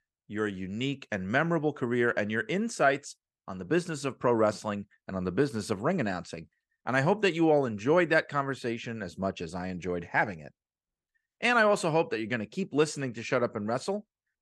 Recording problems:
none

